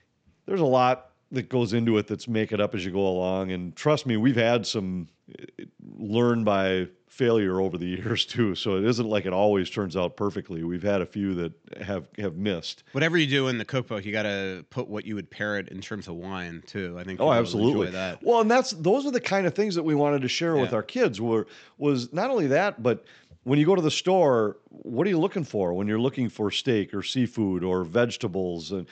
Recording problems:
high frequencies cut off; noticeable; nothing above 8 kHz

